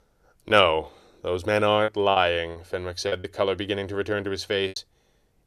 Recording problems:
choppy; very; 7% of the speech affected

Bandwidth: 14 kHz